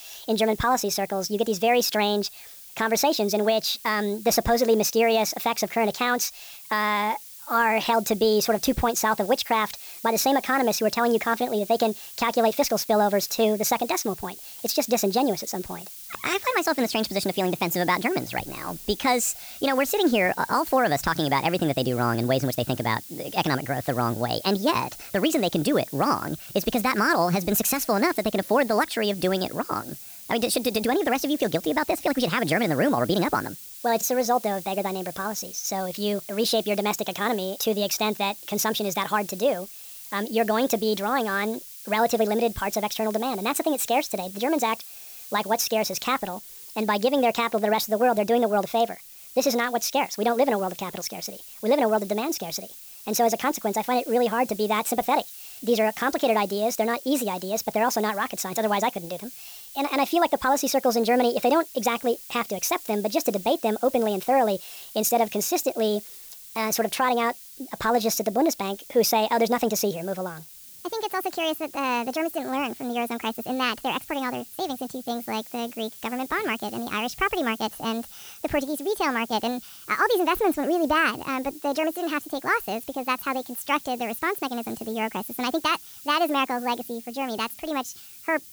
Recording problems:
wrong speed and pitch; too fast and too high; 1.5 times normal speed
hiss; noticeable; throughout; 15 dB below the speech

